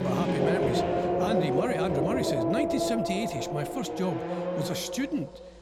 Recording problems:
traffic noise; very loud; throughout; 3 dB above the speech
abrupt cut into speech; at the start

